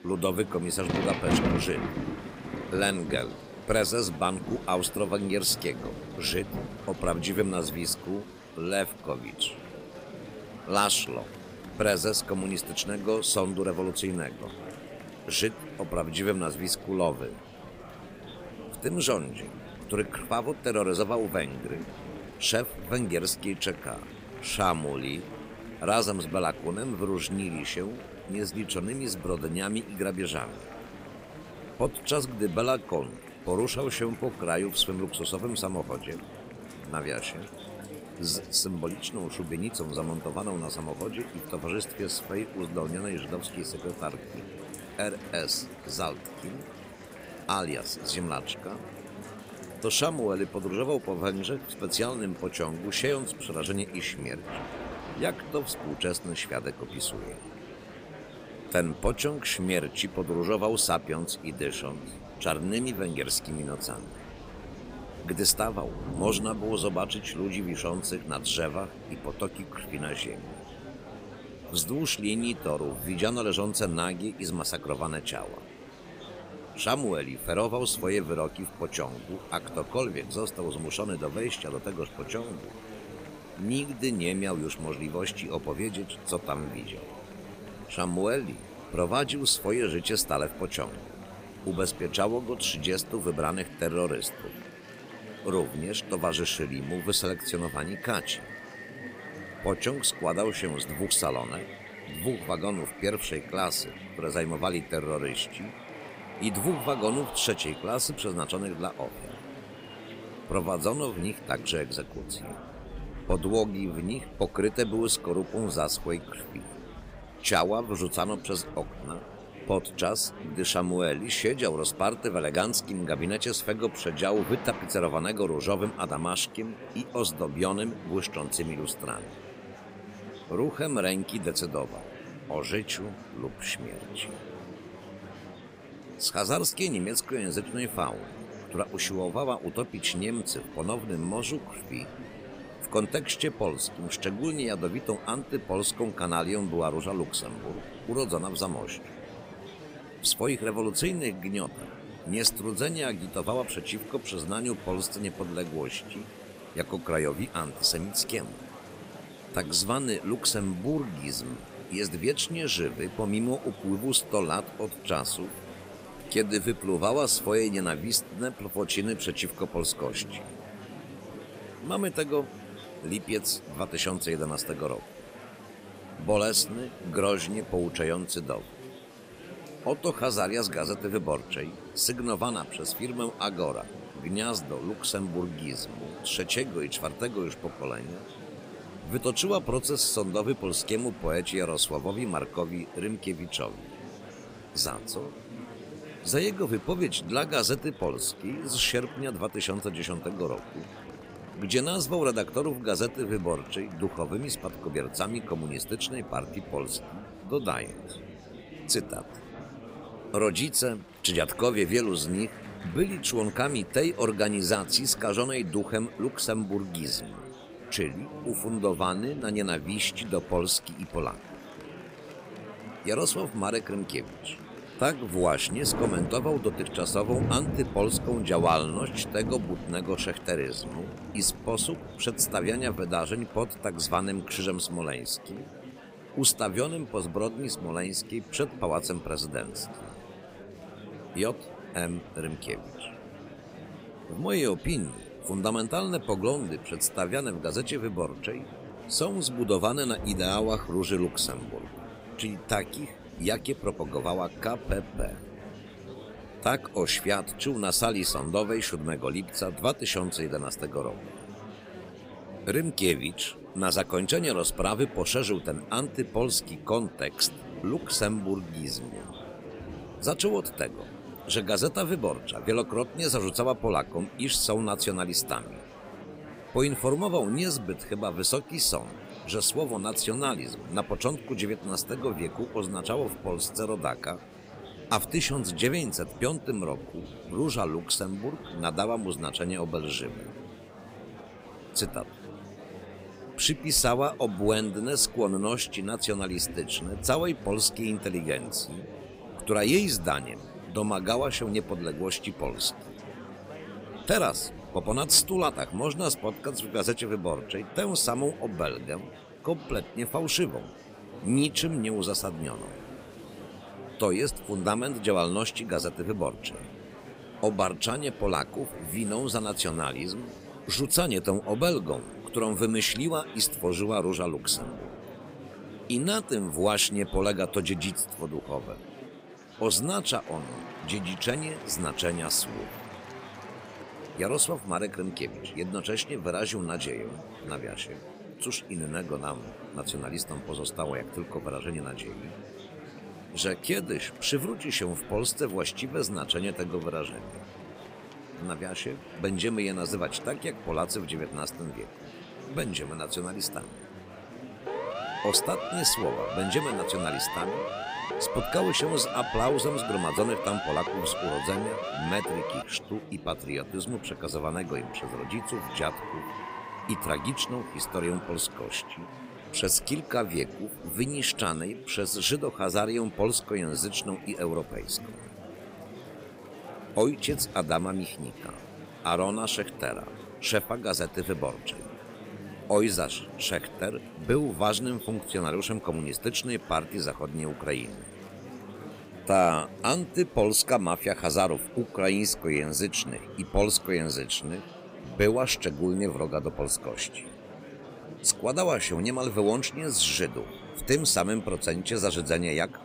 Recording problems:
rain or running water; noticeable; throughout; 15 dB below the speech
murmuring crowd; noticeable; throughout; 15 dB below the speech
siren; noticeable; from 5:55 to 6:03; peak 3 dB below the speech

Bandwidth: 15.5 kHz